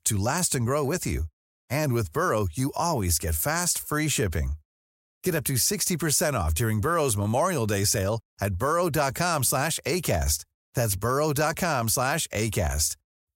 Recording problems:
none

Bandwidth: 16 kHz